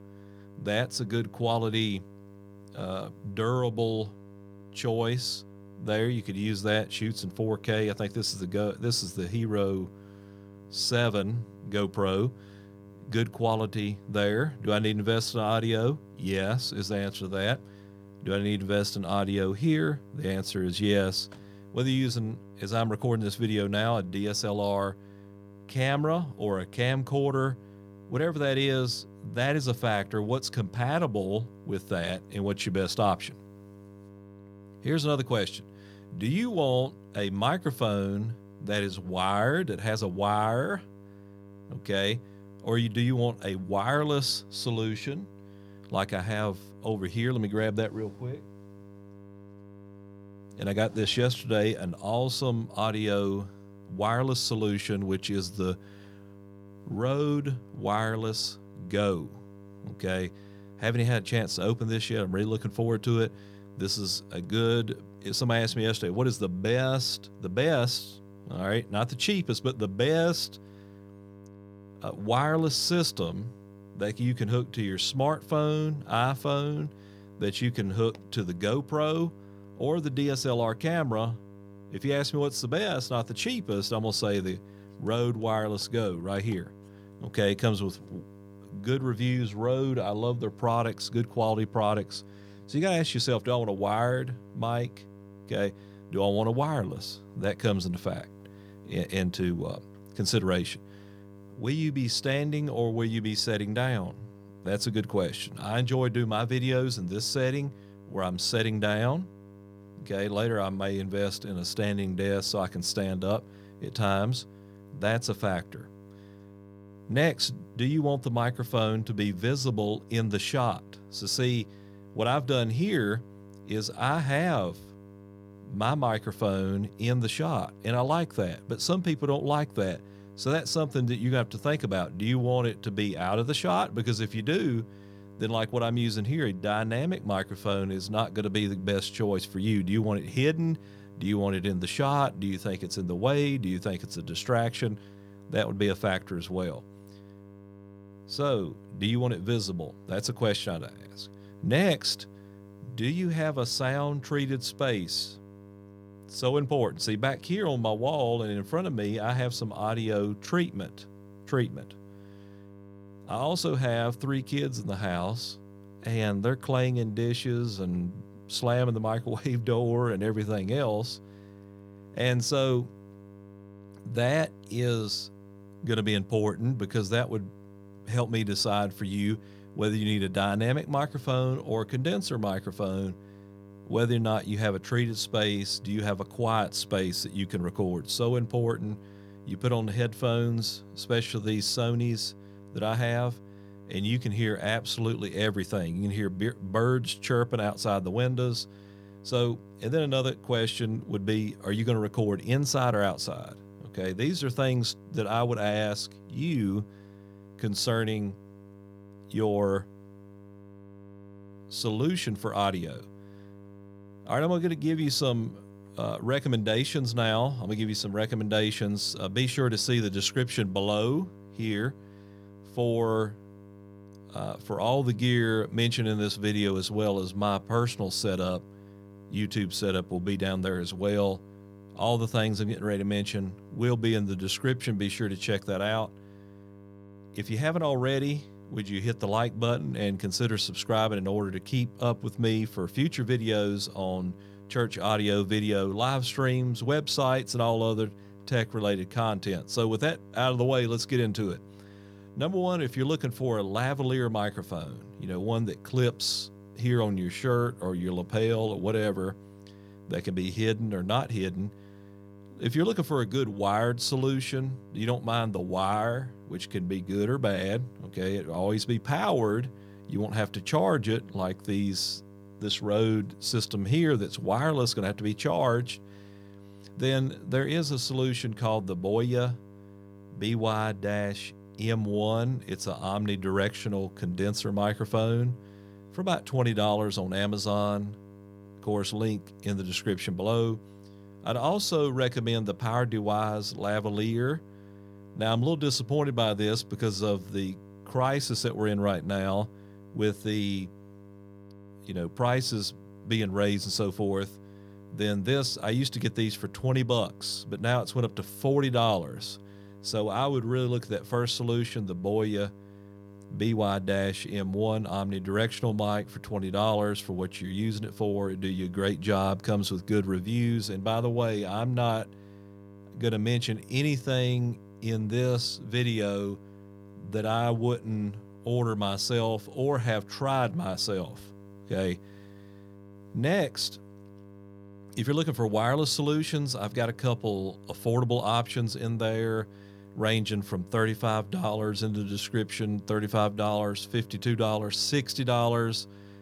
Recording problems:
electrical hum; faint; throughout; 50 Hz, 25 dB below the speech

